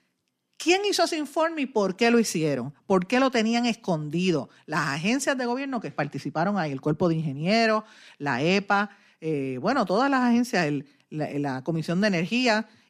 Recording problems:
none

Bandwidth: 15 kHz